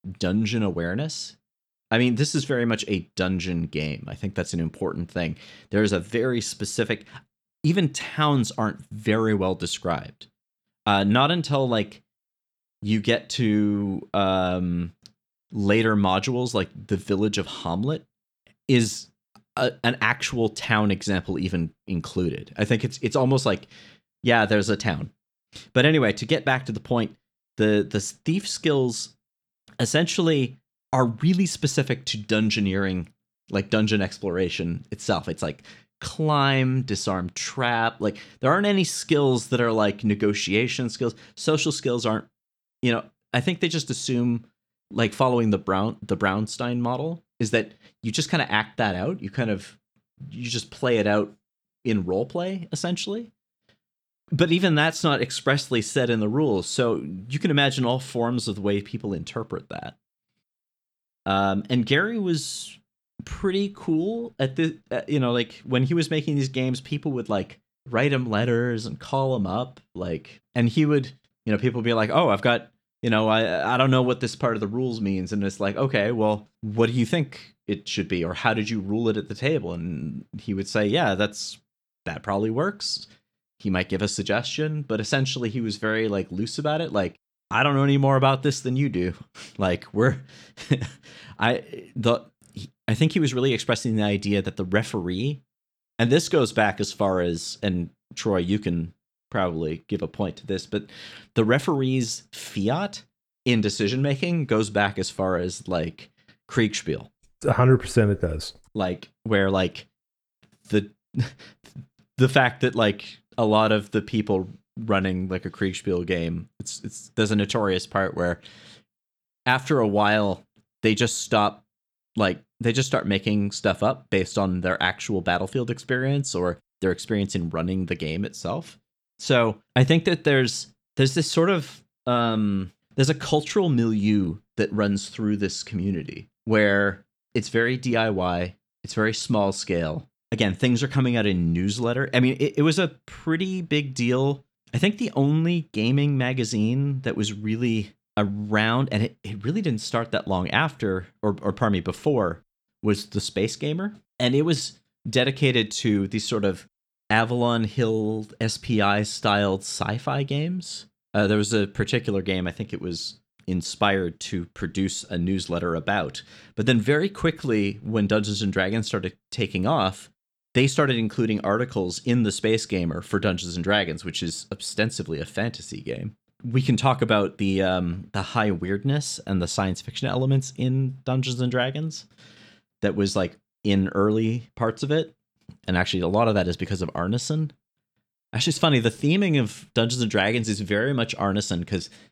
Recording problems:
none

